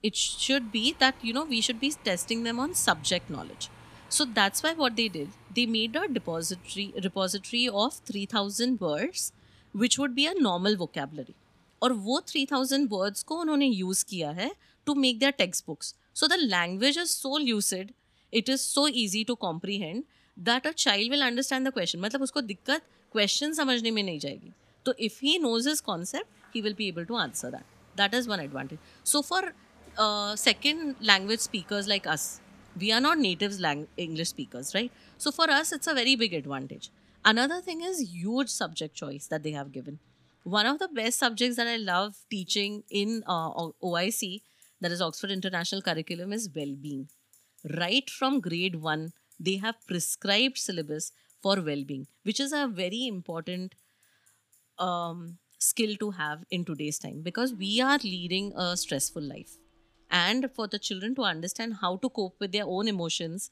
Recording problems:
traffic noise; faint; throughout; 30 dB below the speech

